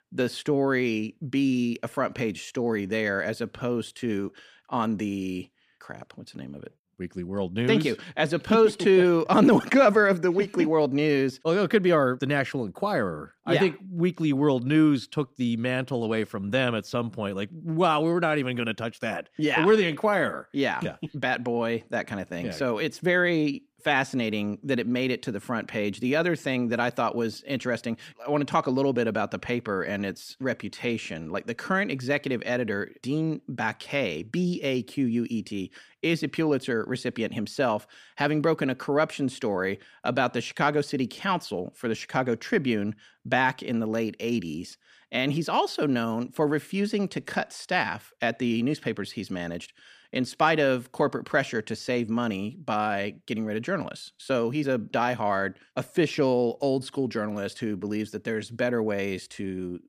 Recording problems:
none

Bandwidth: 15 kHz